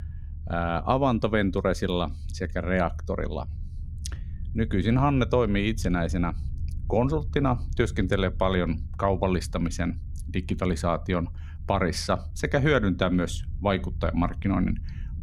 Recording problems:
low rumble; faint; throughout; 25 dB below the speech

